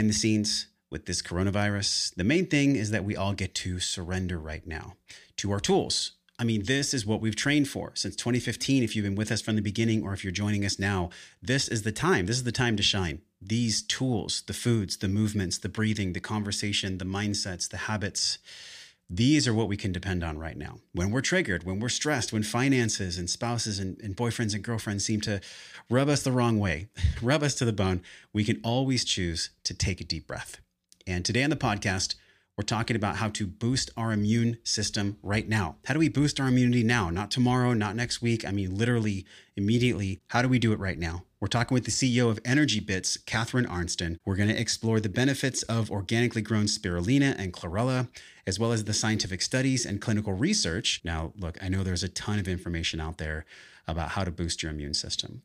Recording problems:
abrupt cut into speech; at the start

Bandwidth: 15 kHz